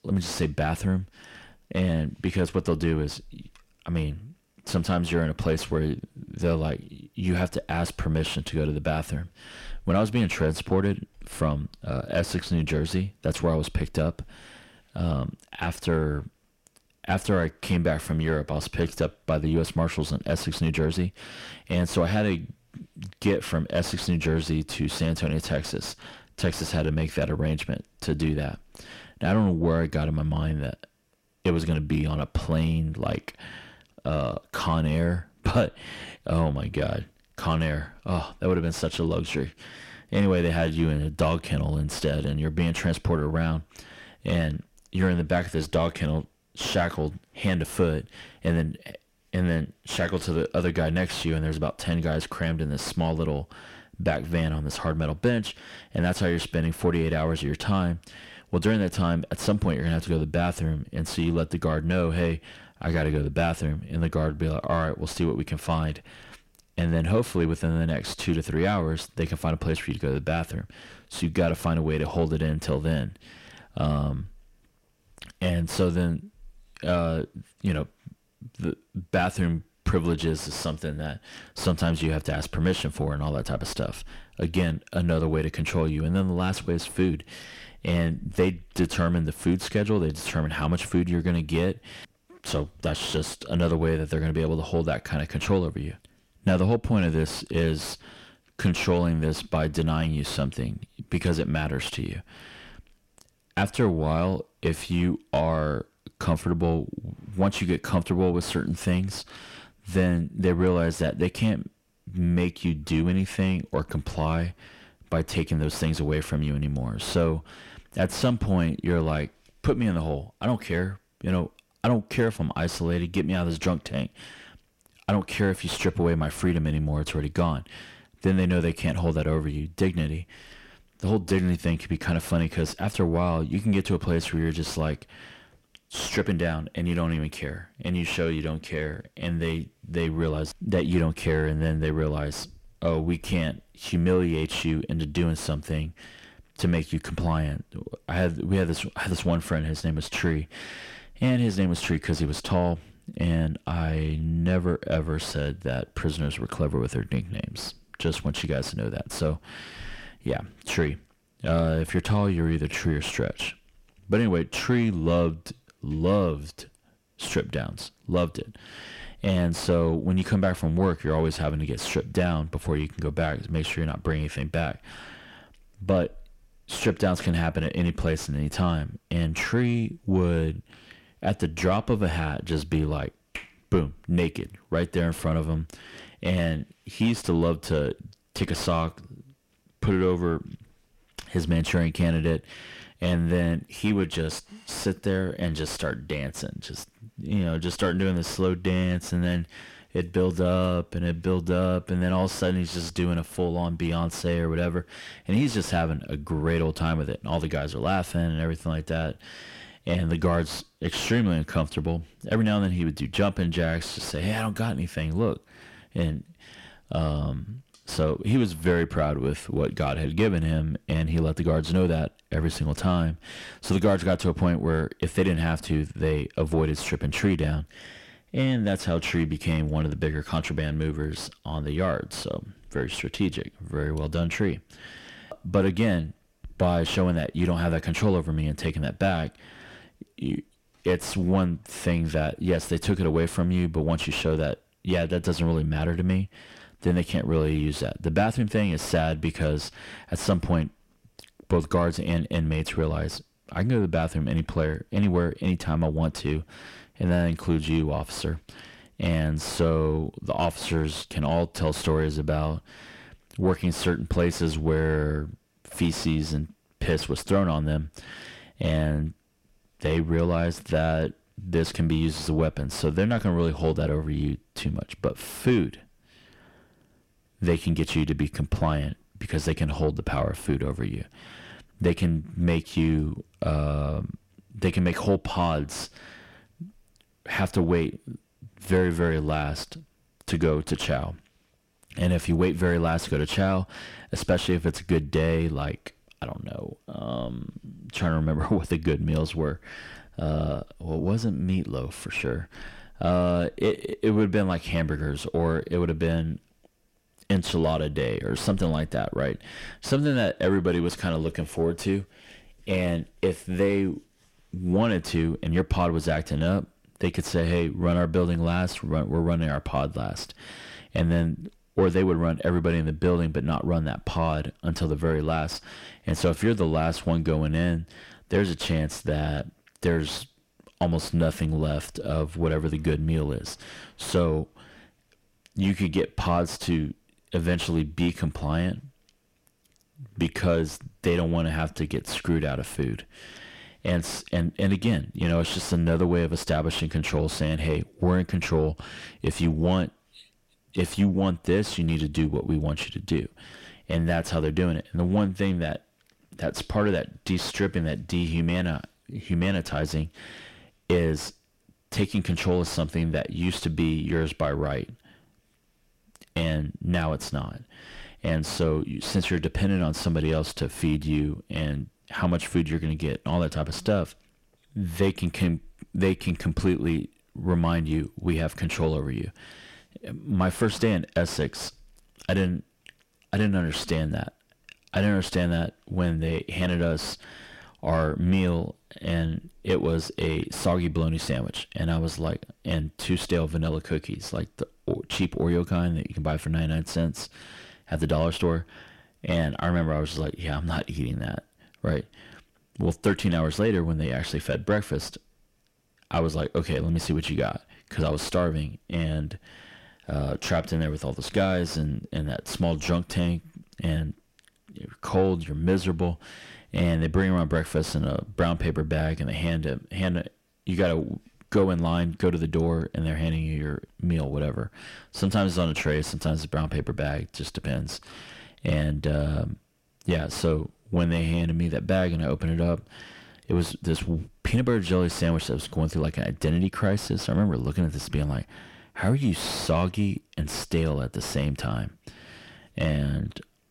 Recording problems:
distortion; slight; 10 dB below the speech

